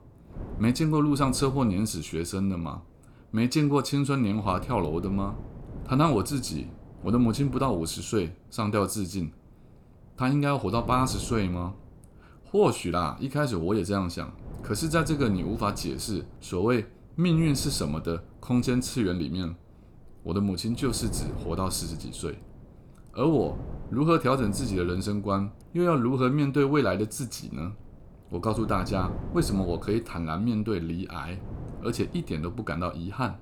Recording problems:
wind noise on the microphone; occasional gusts; 20 dB below the speech

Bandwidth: 18.5 kHz